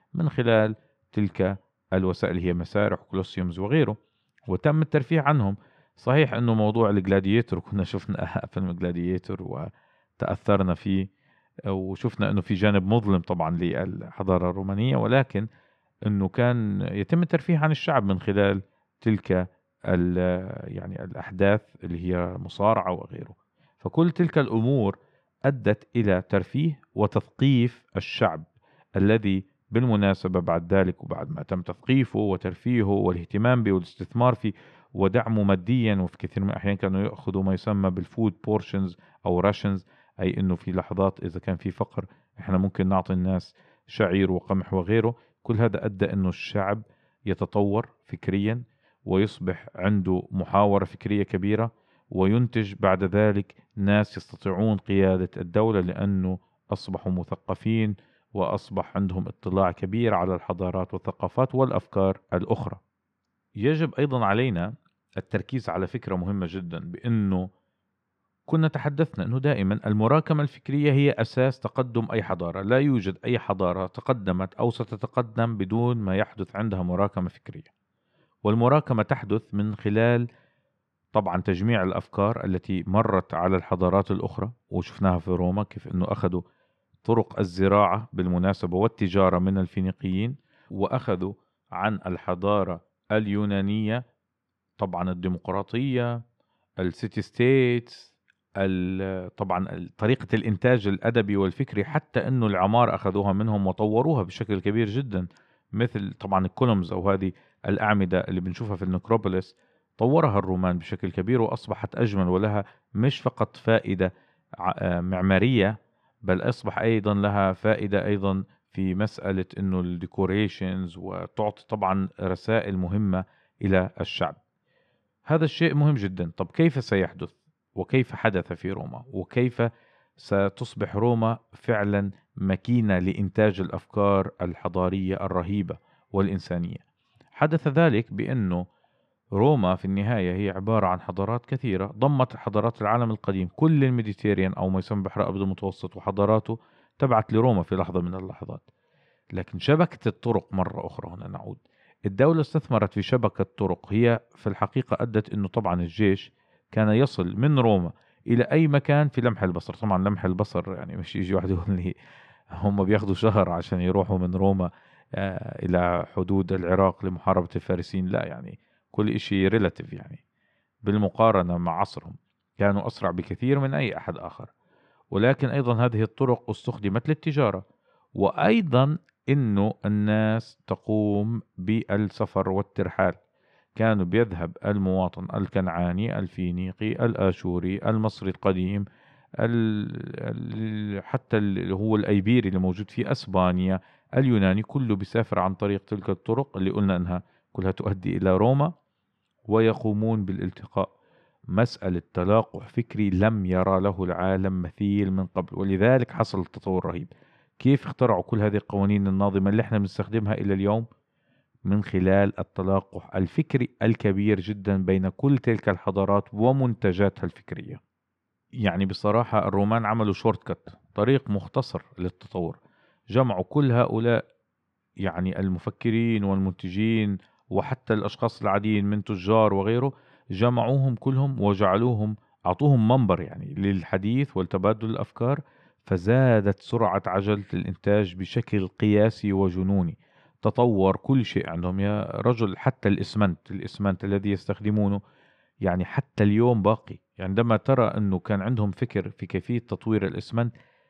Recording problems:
muffled; slightly; fading above 2.5 kHz

